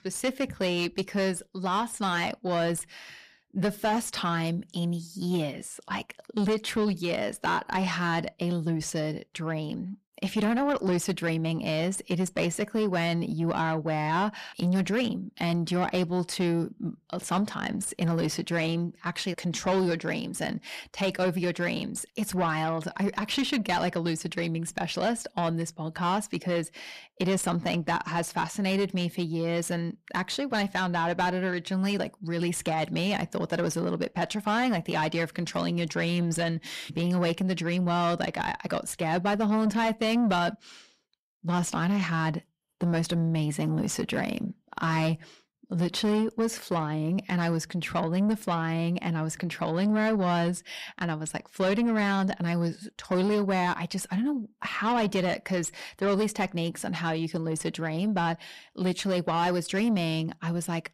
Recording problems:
distortion; slight; 10 dB below the speech

